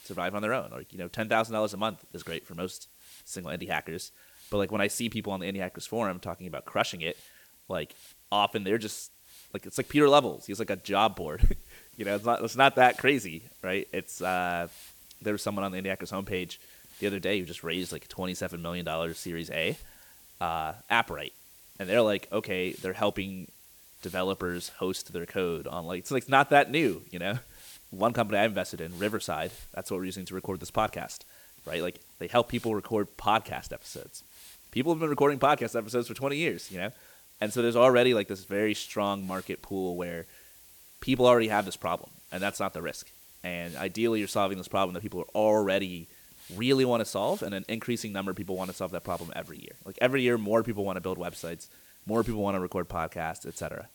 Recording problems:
hiss; faint; throughout; 20 dB below the speech

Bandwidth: 18.5 kHz